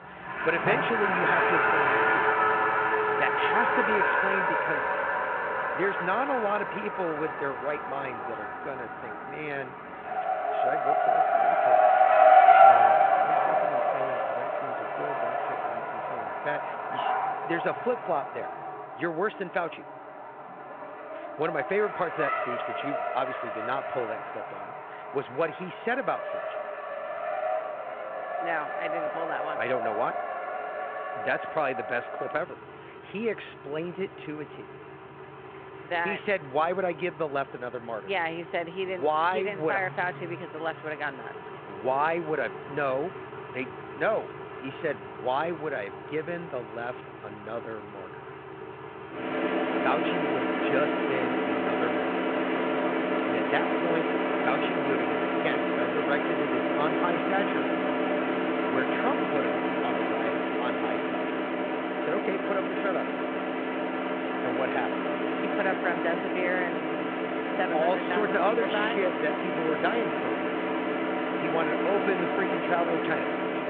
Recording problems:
phone-call audio
traffic noise; very loud; throughout; 5 dB above the speech

